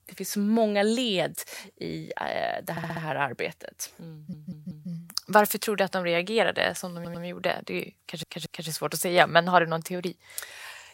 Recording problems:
audio stuttering; 4 times, first at 2.5 s

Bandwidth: 16 kHz